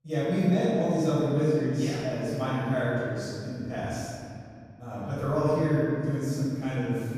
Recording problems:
room echo; strong; dies away in 2.4 s
off-mic speech; far

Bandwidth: 14.5 kHz